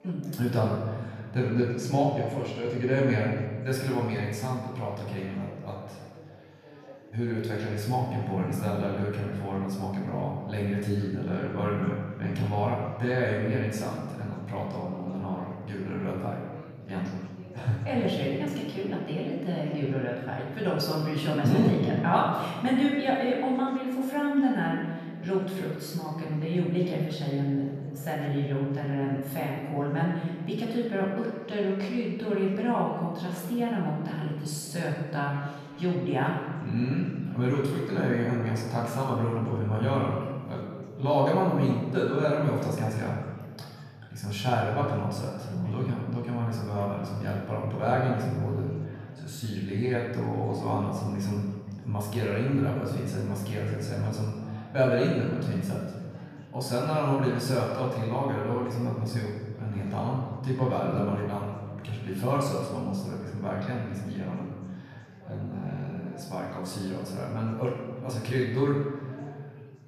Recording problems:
off-mic speech; far
room echo; noticeable; dies away in 1.5 s
chatter from many people; faint; throughout; 20 dB below the speech

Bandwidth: 14 kHz